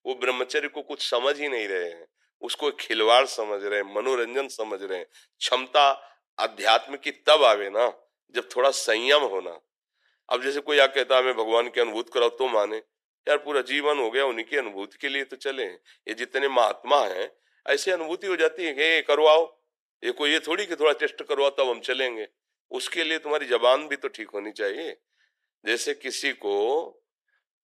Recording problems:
thin; very; fading below 400 Hz

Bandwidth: 13.5 kHz